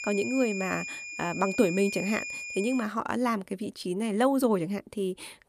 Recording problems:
high-pitched whine; loud; until 3 s; 2.5 kHz, 6 dB below the speech

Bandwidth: 14.5 kHz